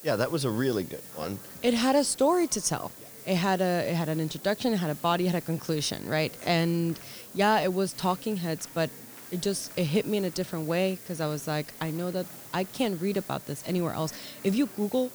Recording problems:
hiss; noticeable; throughout; 15 dB below the speech
murmuring crowd; faint; throughout; 25 dB below the speech

